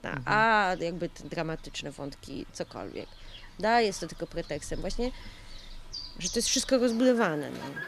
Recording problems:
animal sounds; noticeable; throughout; 15 dB below the speech

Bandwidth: 14.5 kHz